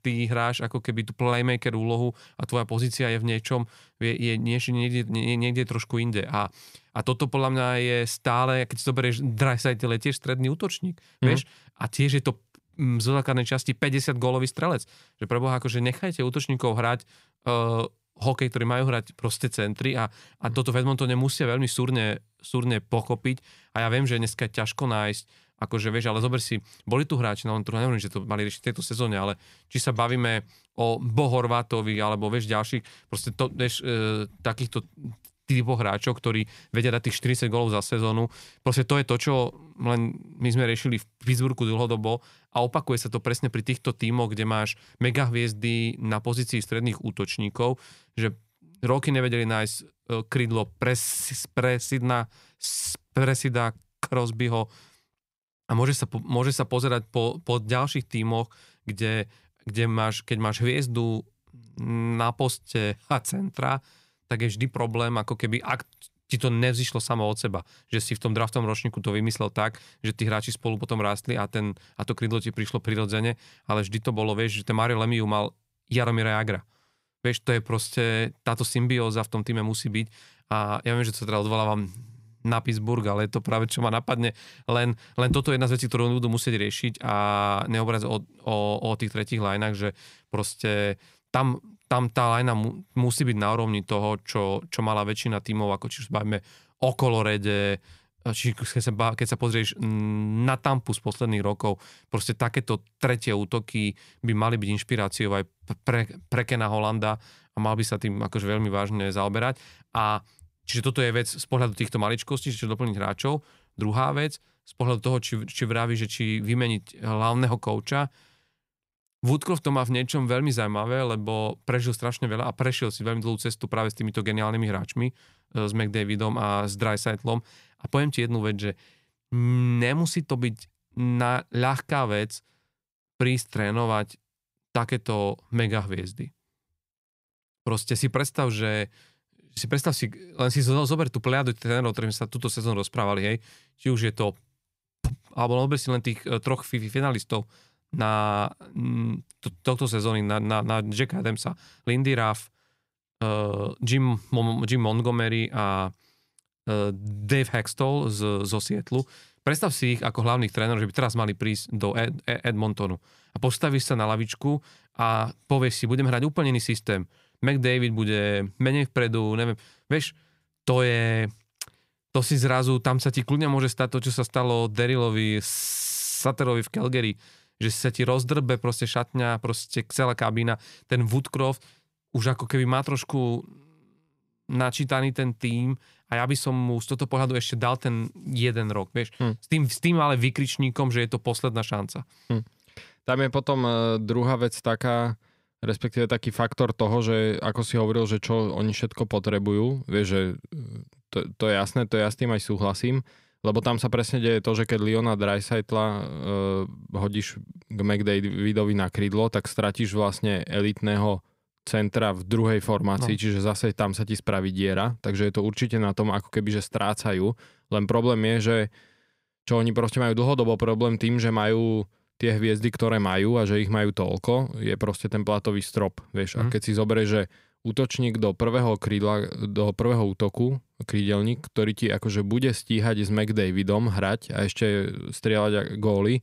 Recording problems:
none

